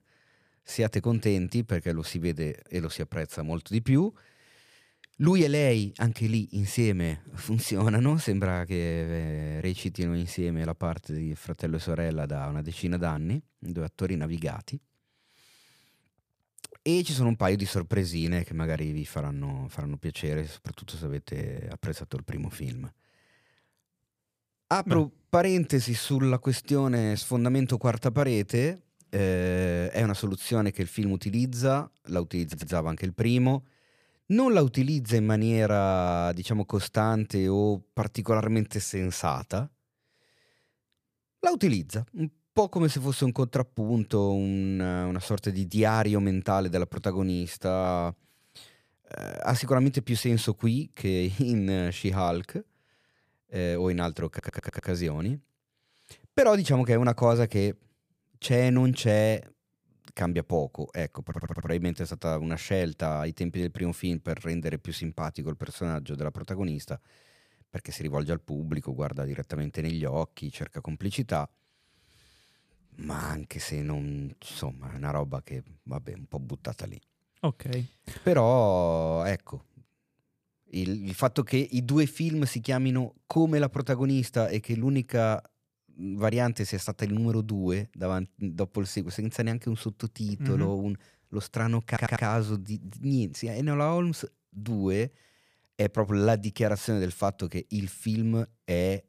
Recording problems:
audio stuttering; 4 times, first at 32 s

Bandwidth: 15 kHz